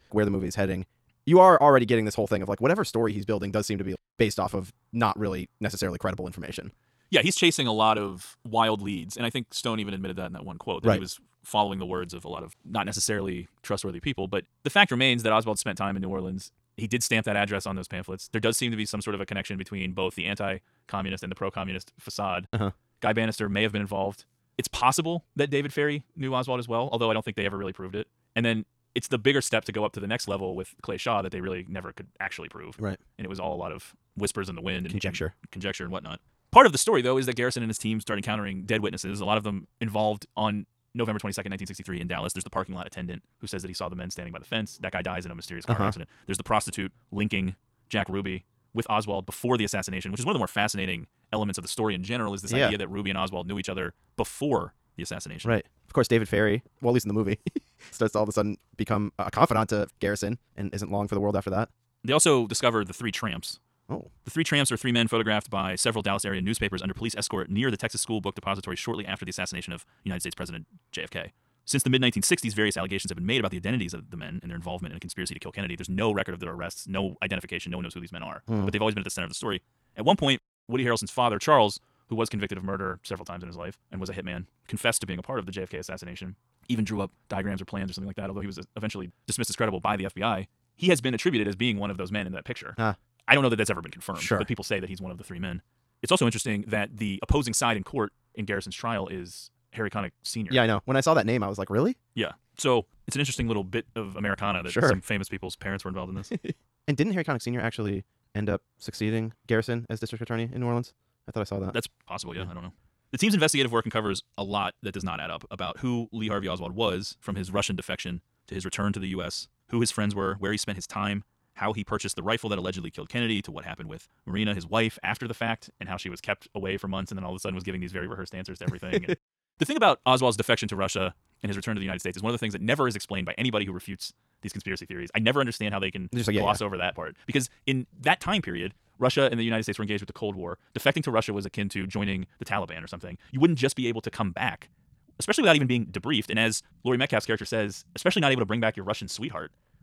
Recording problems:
wrong speed, natural pitch; too fast; 1.7 times normal speed

